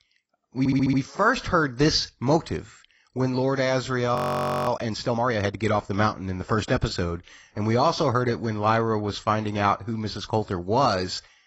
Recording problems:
garbled, watery; badly; nothing above 16 kHz
audio stuttering; at 0.5 s
audio freezing; at 4 s for 0.5 s

